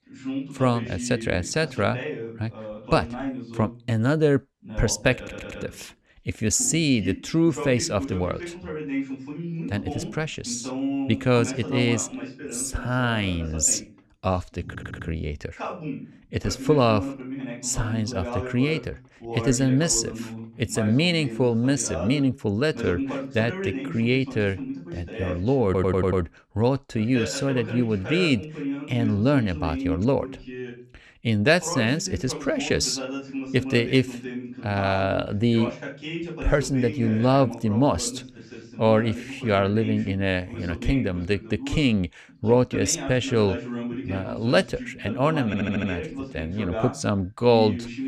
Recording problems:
voice in the background; loud; throughout; 10 dB below the speech
audio stuttering; 4 times, first at 5 s

